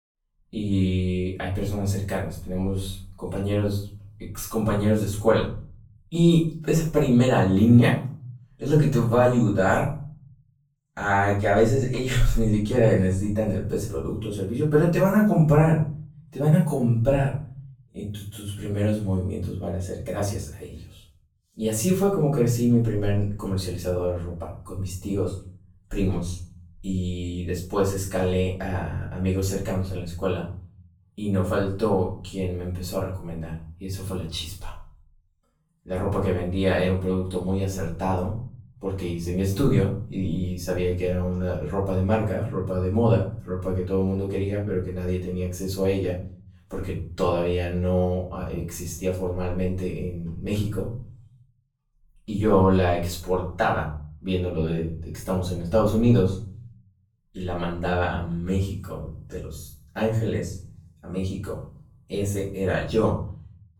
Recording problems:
off-mic speech; far
room echo; noticeable; dies away in 0.5 s

